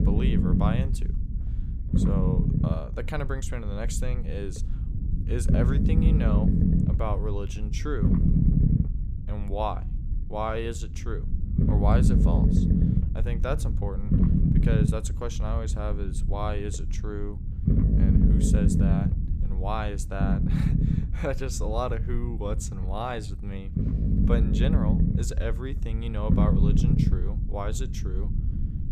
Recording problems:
low rumble; loud; throughout; 1 dB below the speech

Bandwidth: 15 kHz